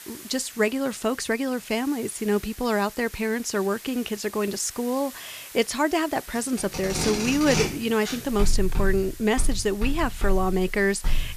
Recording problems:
household noises; loud; from 6.5 s on; 5 dB below the speech
hiss; noticeable; throughout; 15 dB below the speech

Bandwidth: 14.5 kHz